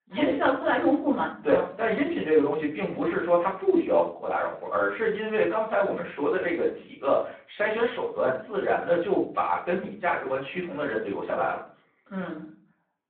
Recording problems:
off-mic speech; far
room echo; slight; dies away in 0.4 s
phone-call audio

